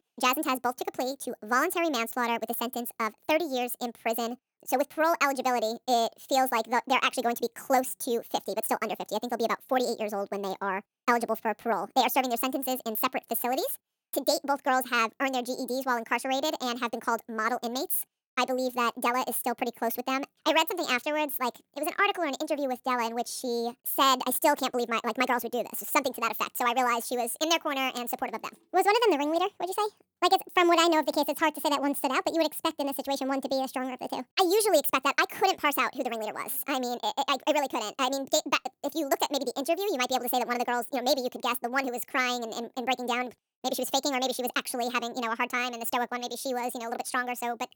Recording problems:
wrong speed and pitch; too fast and too high; 1.6 times normal speed

